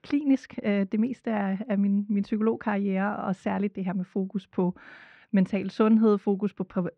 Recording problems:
muffled; slightly; fading above 2.5 kHz

